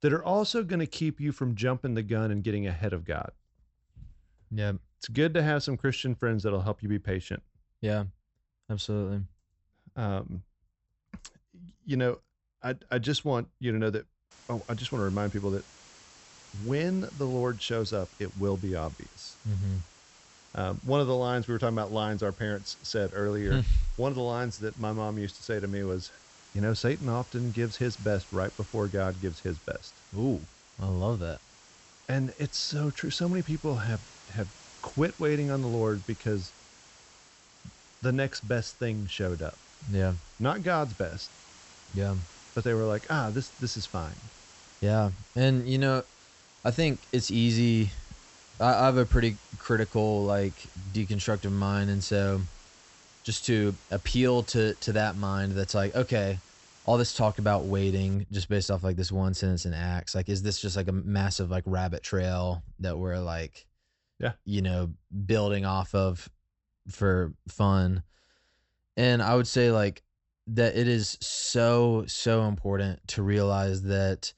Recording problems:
high frequencies cut off; noticeable; nothing above 8 kHz
hiss; faint; from 14 to 58 s; 25 dB below the speech

